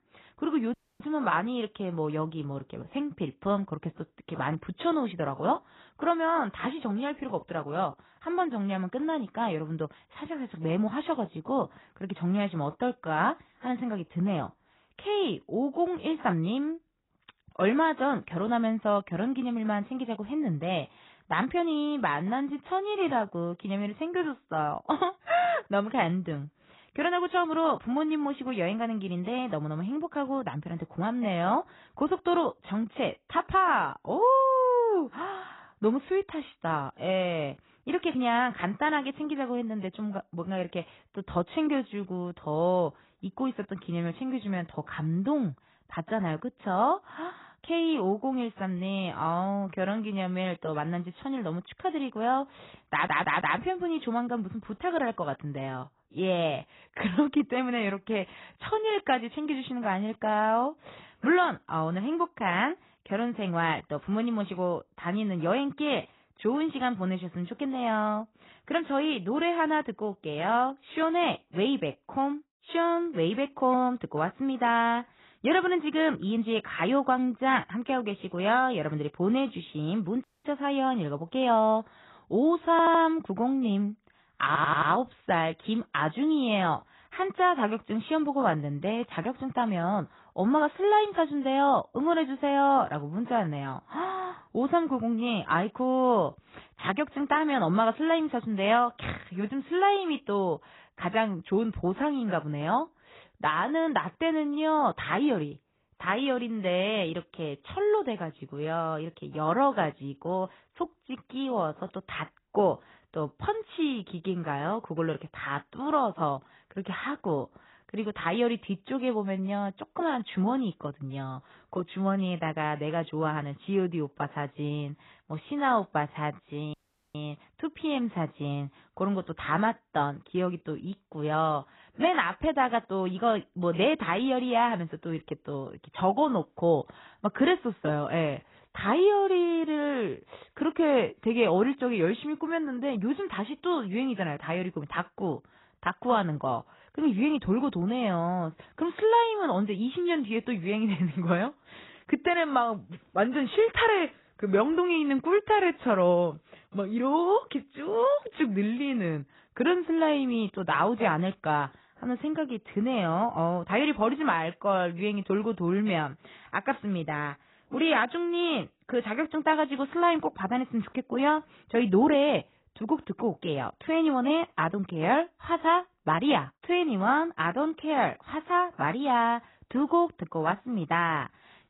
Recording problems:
garbled, watery; badly; nothing above 4 kHz
audio cutting out; at 0.5 s, at 1:20 and at 2:07
audio stuttering; at 53 s, at 1:23 and at 1:24

